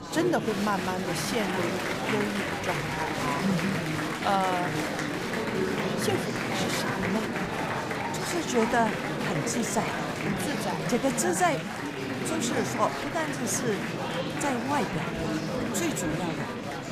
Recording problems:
murmuring crowd; very loud; throughout; as loud as the speech

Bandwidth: 14.5 kHz